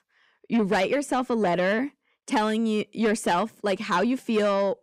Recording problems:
distortion; slight; 10 dB below the speech

